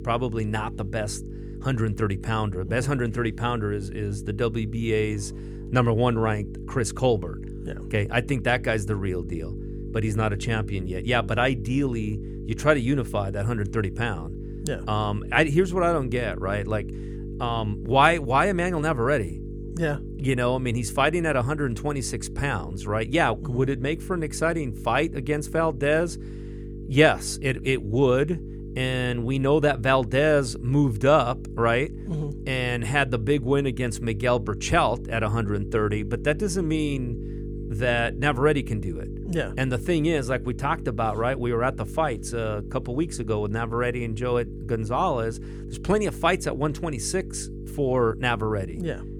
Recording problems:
electrical hum; noticeable; throughout; 50 Hz, 15 dB below the speech

